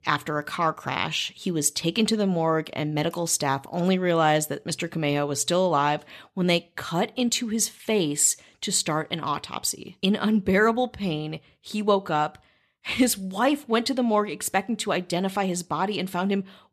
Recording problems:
none

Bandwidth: 13.5 kHz